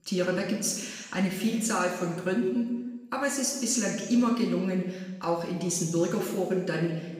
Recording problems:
off-mic speech; far
room echo; noticeable; dies away in 1.2 s

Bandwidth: 15.5 kHz